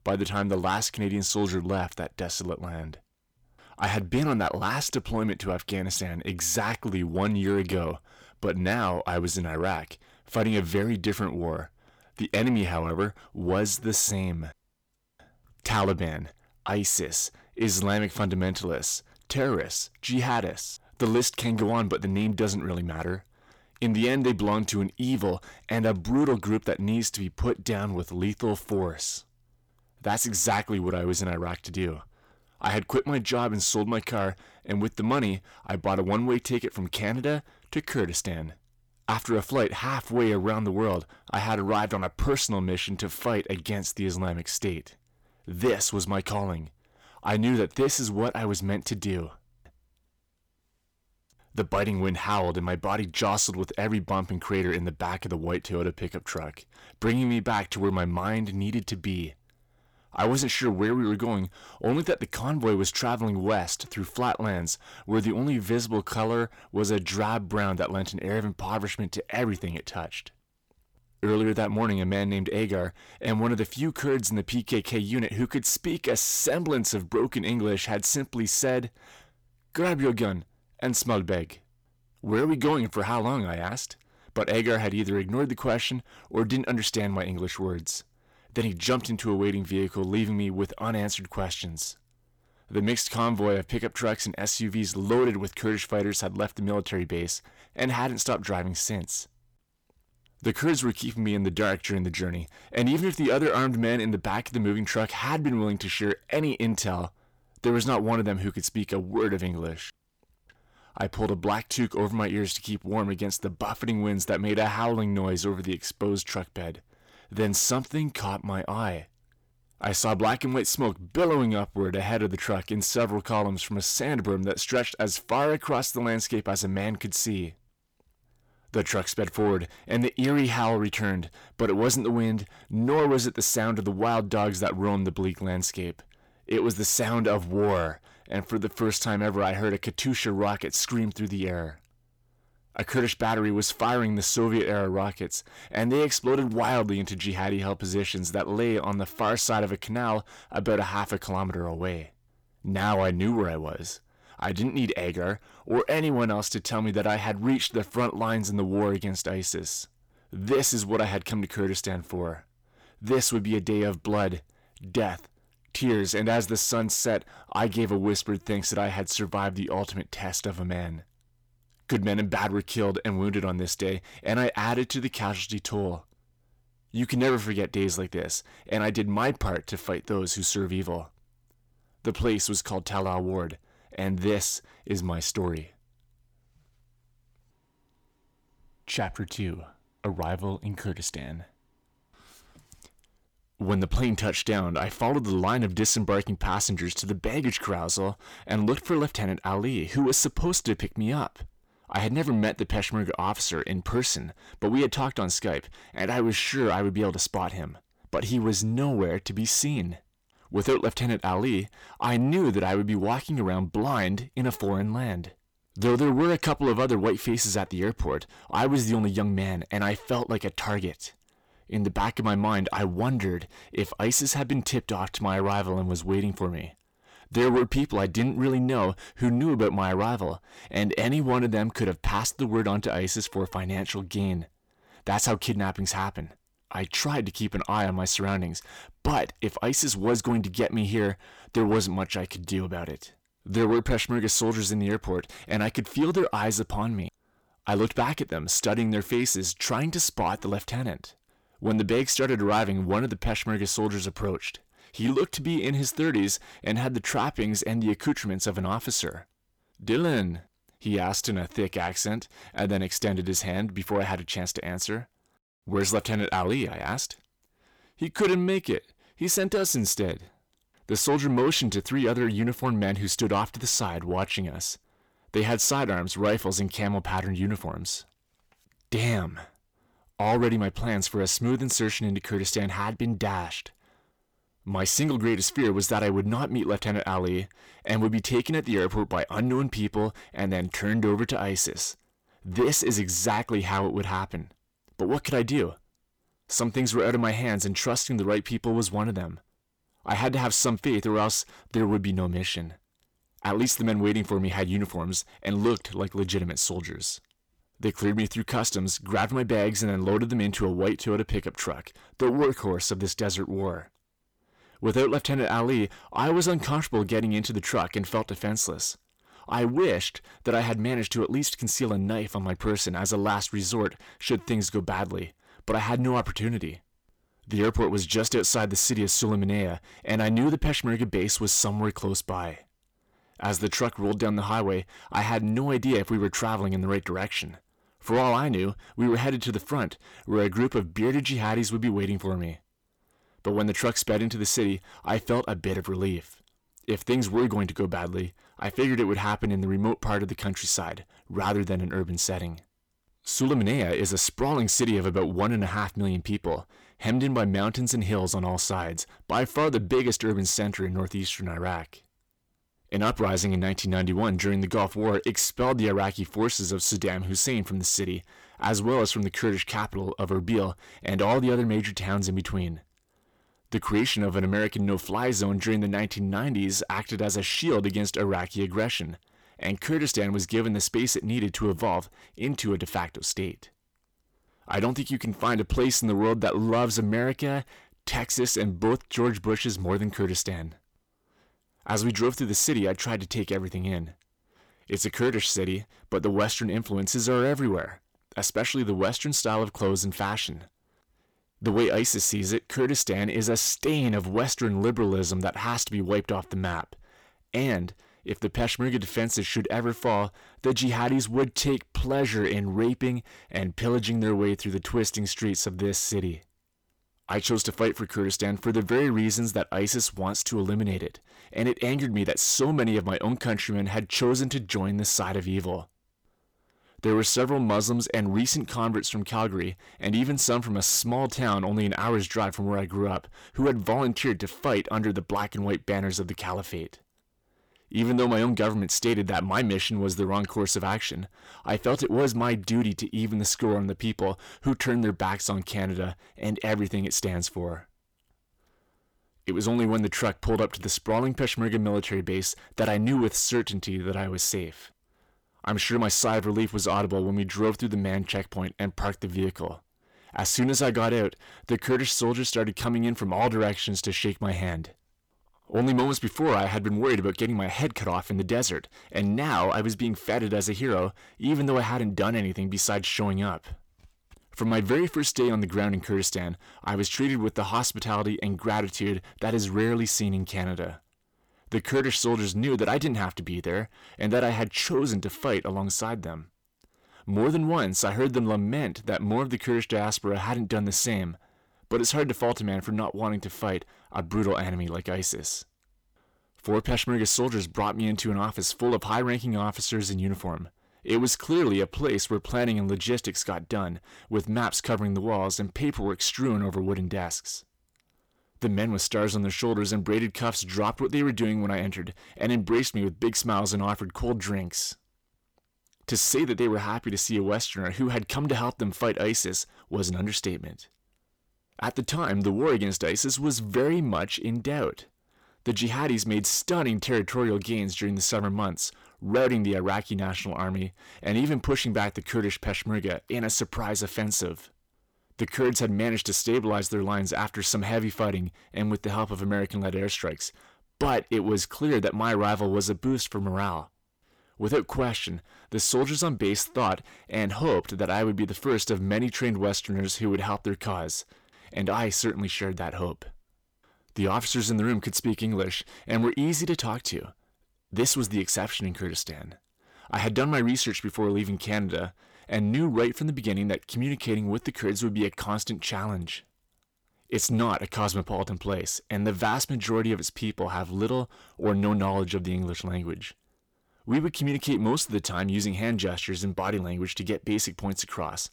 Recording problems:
distortion; slight; 10 dB below the speech

